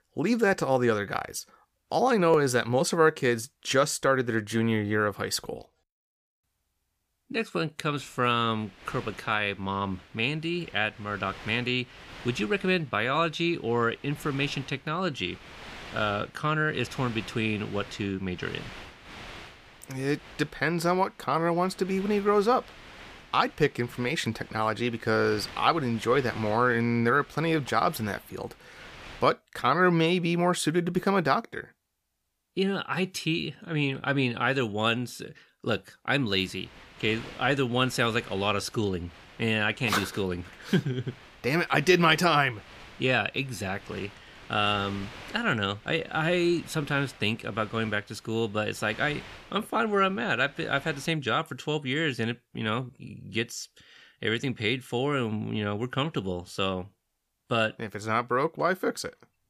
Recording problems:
wind noise on the microphone; occasional gusts; from 8 to 29 s and from 36 to 51 s; 20 dB below the speech

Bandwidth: 15 kHz